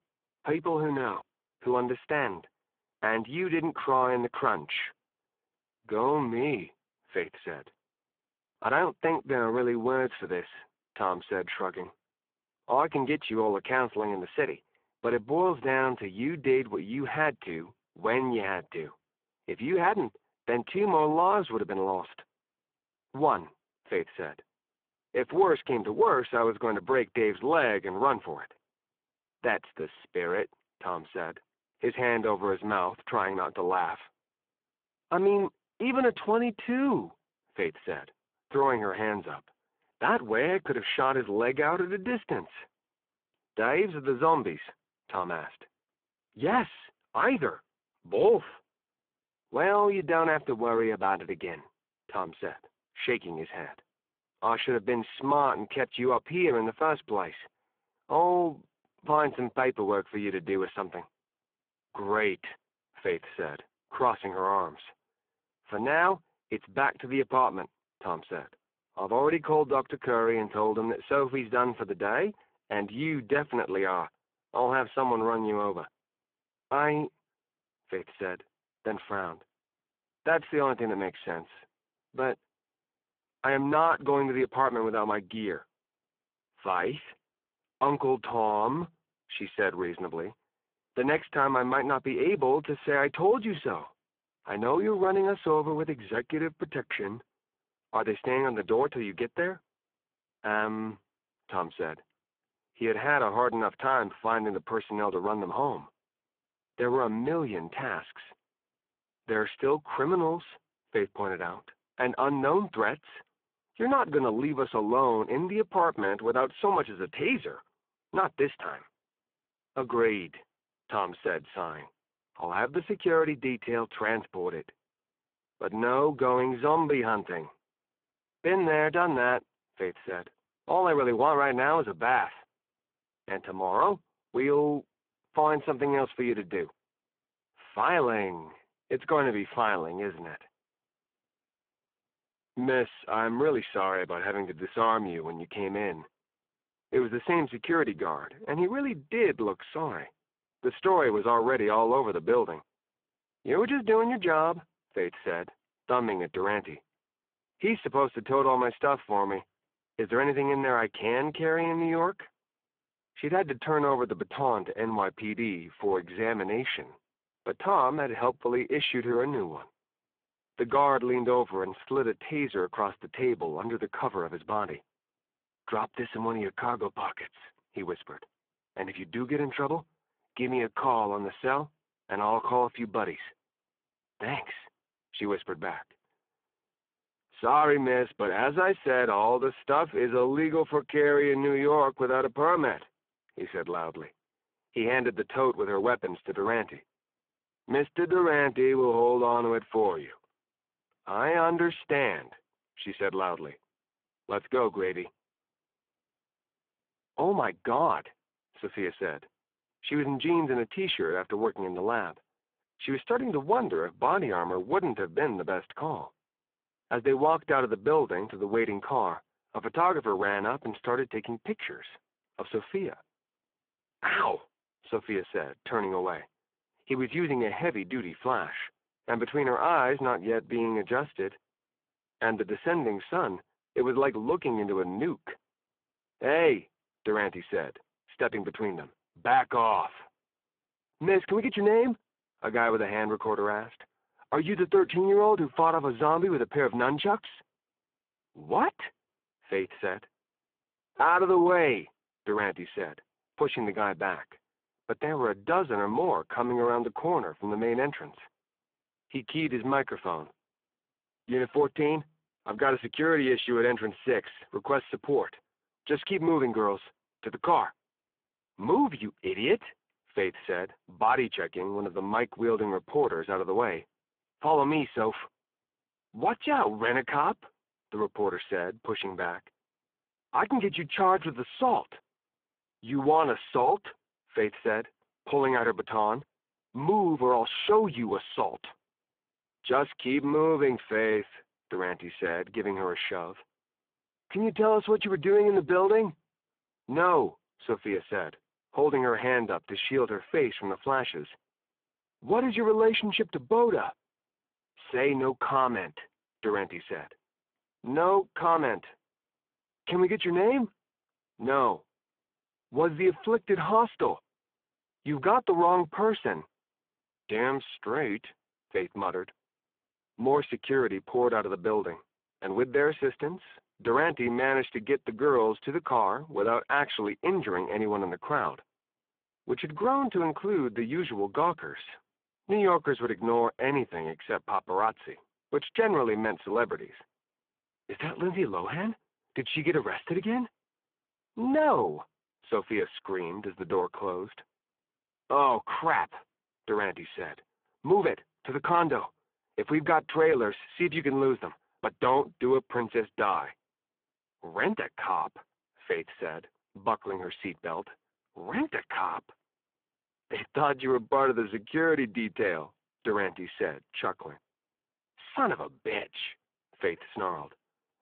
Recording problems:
phone-call audio; poor line

